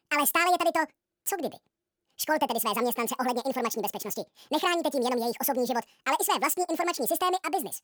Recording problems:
wrong speed and pitch; too fast and too high; 1.7 times normal speed

